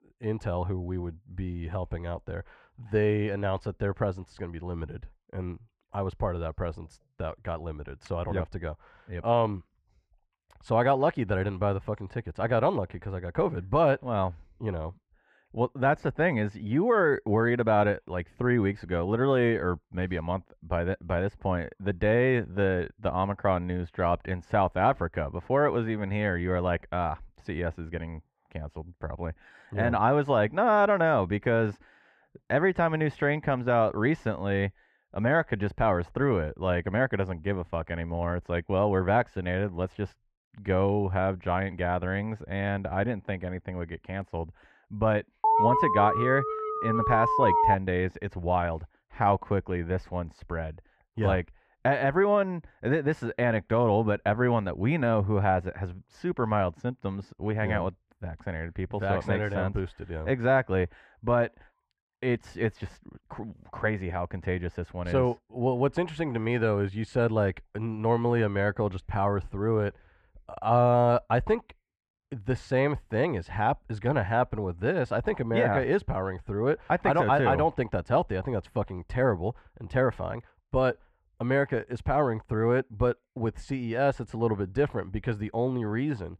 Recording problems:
muffled; very; fading above 2 kHz
alarm; loud; from 45 to 48 s; peak 5 dB above the speech

